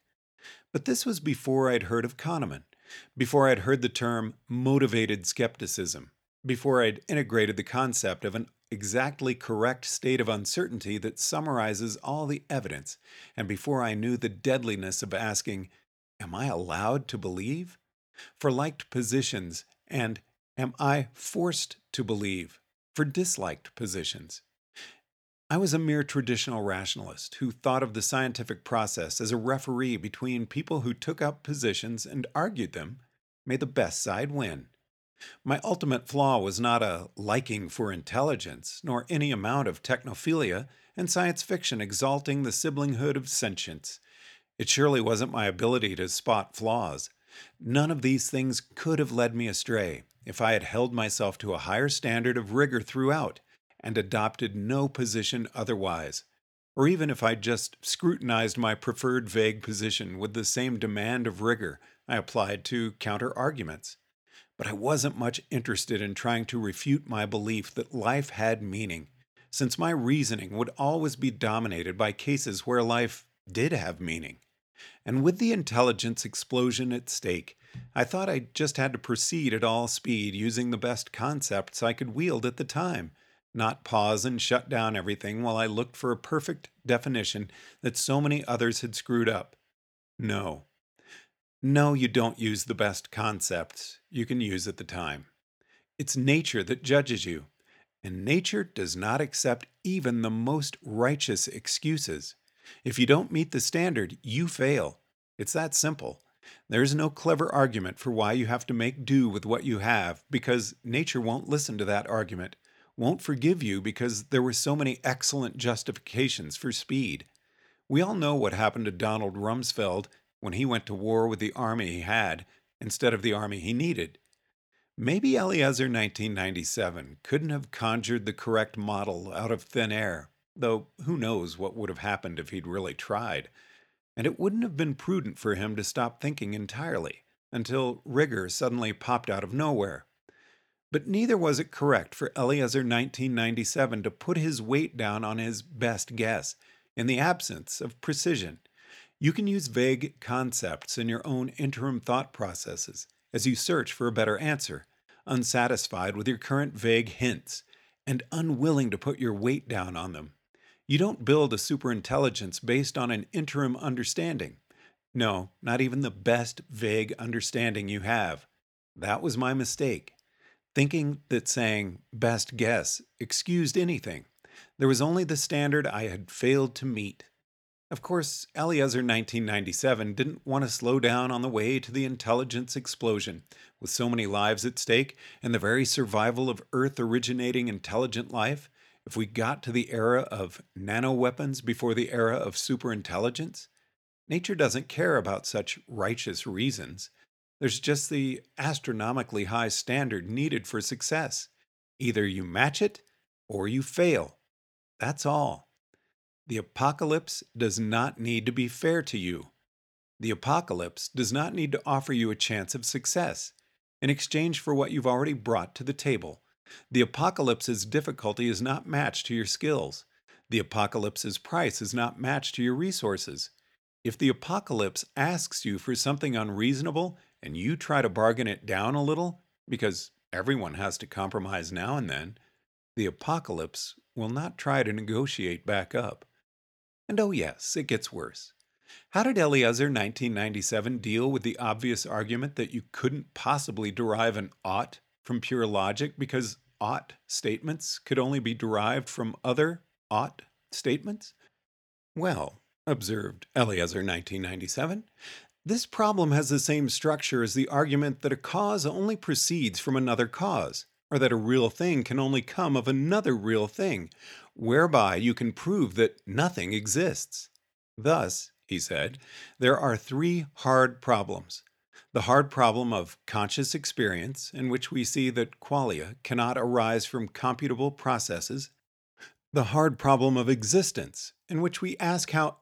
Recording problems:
none

